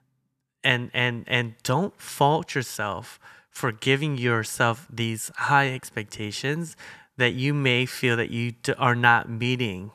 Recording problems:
none

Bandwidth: 14 kHz